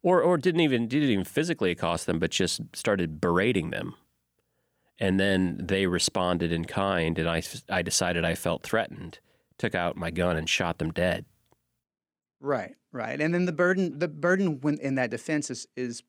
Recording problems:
none

